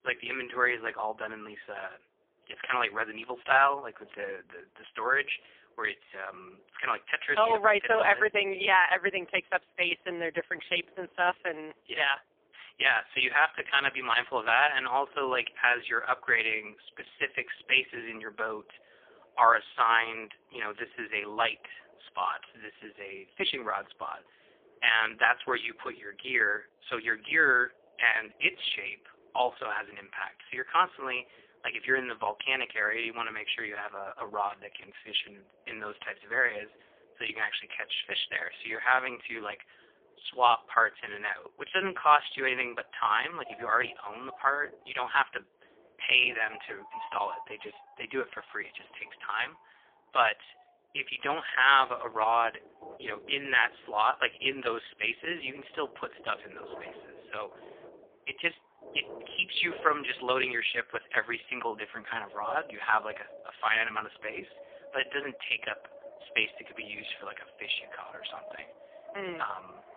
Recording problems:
phone-call audio; poor line; nothing above 3.5 kHz
wind in the background; faint; throughout; 25 dB below the speech

